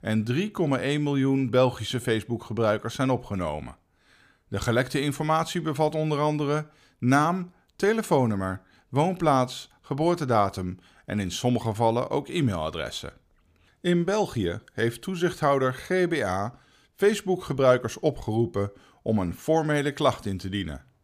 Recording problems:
none

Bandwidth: 15 kHz